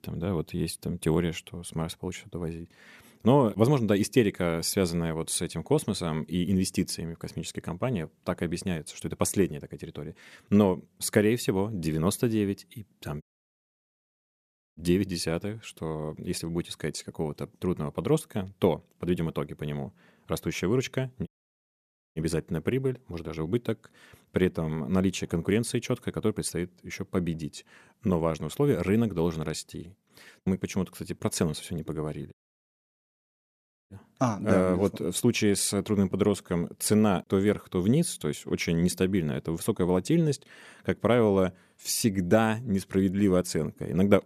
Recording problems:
audio cutting out; at 13 s for 1.5 s, at 21 s for 1 s and at 32 s for 1.5 s

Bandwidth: 14.5 kHz